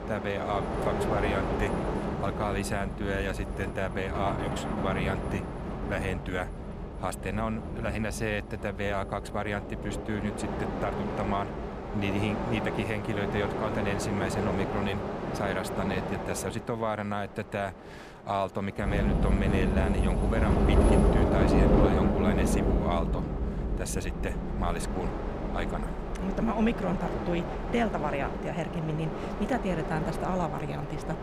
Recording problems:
train or aircraft noise; very loud; throughout; 2 dB above the speech

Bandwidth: 15 kHz